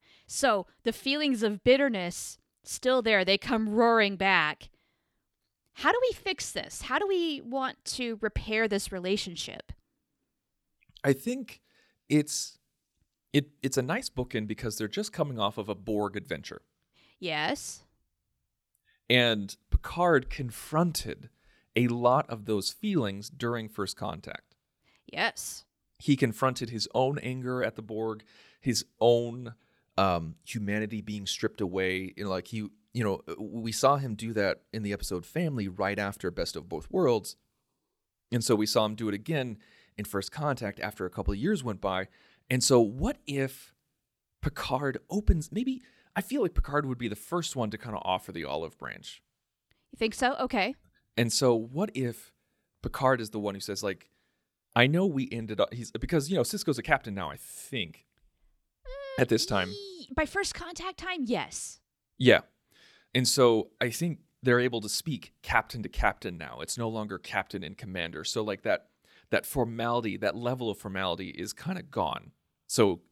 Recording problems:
none

